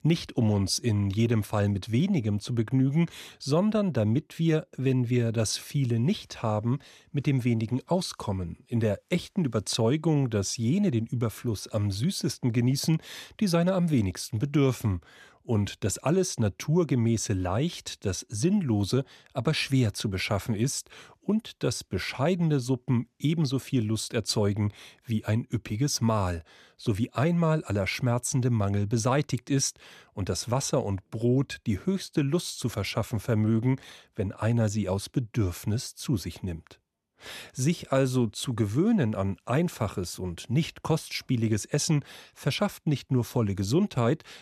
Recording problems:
none

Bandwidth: 14 kHz